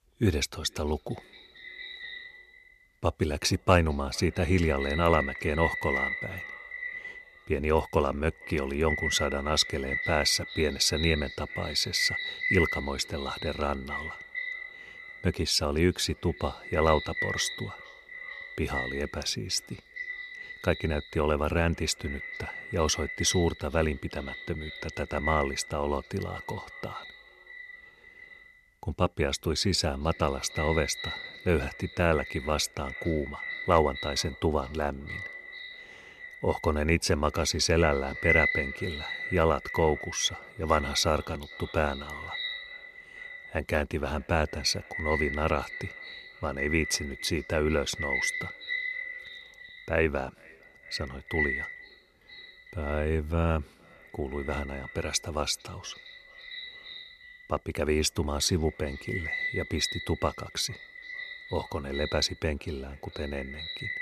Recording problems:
echo of what is said; strong; throughout; 450 ms later, 6 dB below the speech

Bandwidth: 13.5 kHz